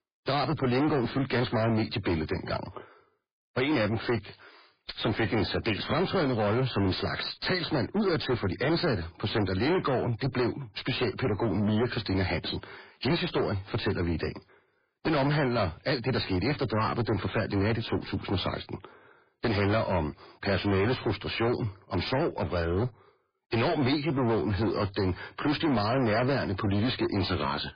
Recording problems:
distortion; heavy; 6 dB below the speech
garbled, watery; badly; nothing above 4.5 kHz

